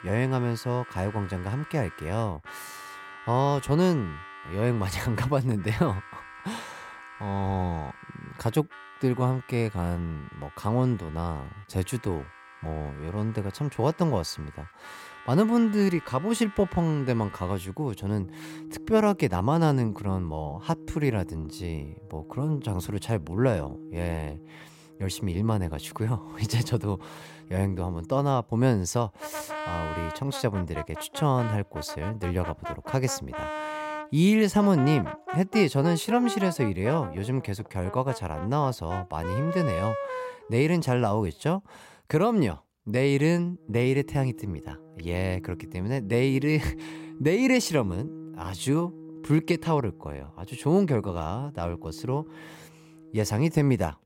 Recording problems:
background music; noticeable; throughout; 15 dB below the speech

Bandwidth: 16 kHz